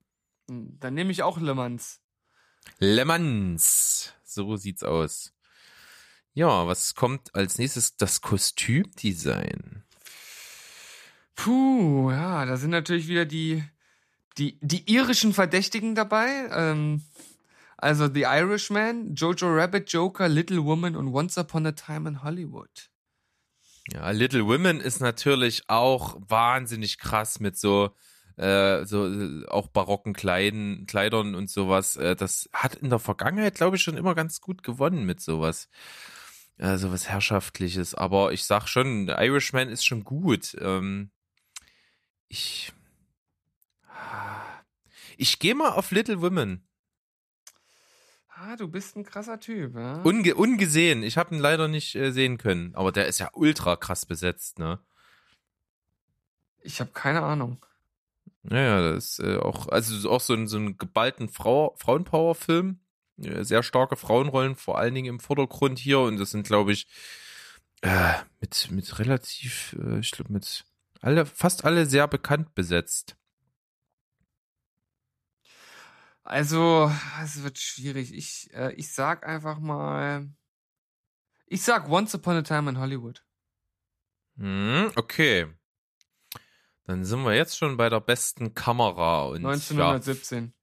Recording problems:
none

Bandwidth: 14.5 kHz